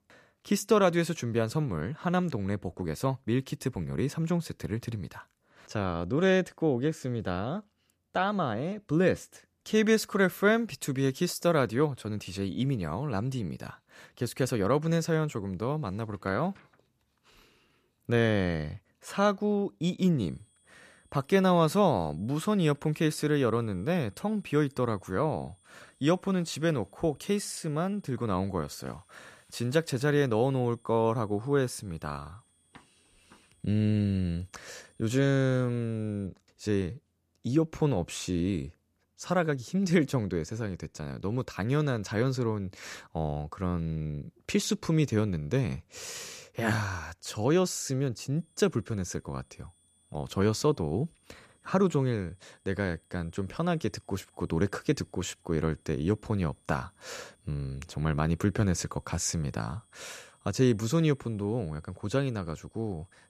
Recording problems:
high-pitched whine; faint; from 20 to 36 s and from 48 s on; 9 kHz, 35 dB below the speech

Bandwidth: 14.5 kHz